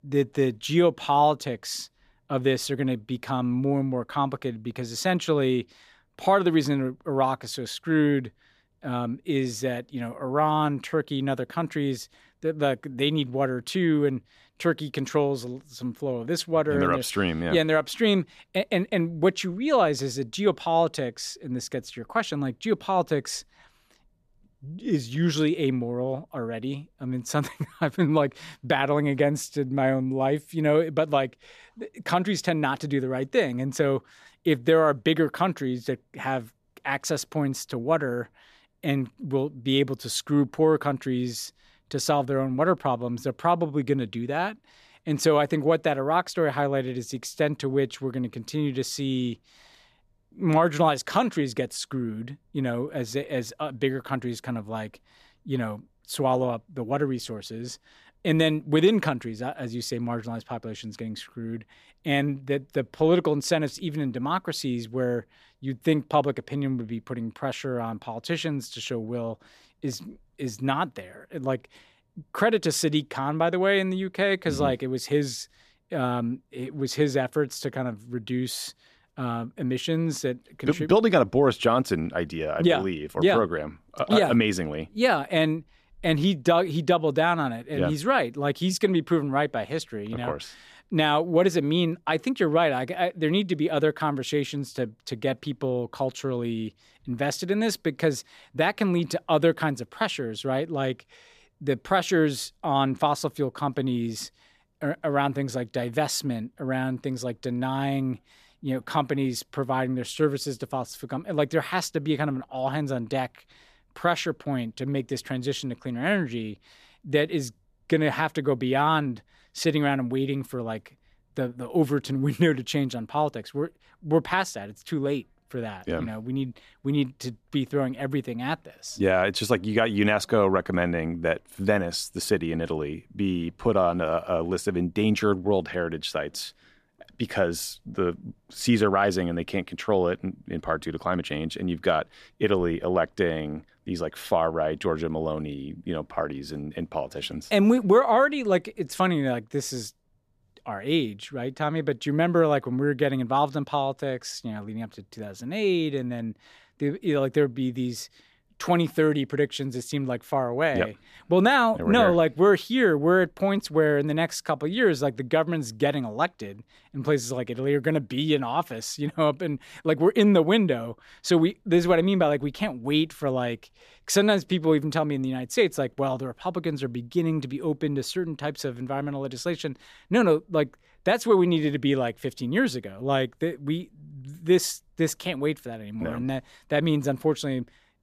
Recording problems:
none

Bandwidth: 14.5 kHz